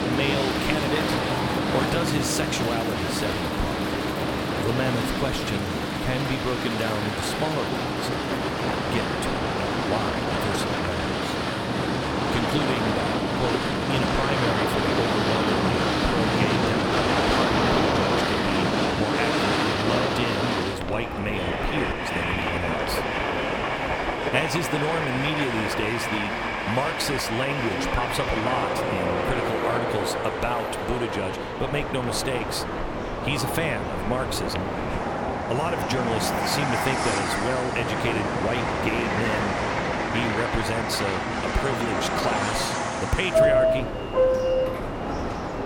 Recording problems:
train or aircraft noise; very loud; throughout; 4 dB above the speech
murmuring crowd; loud; throughout; 7 dB below the speech

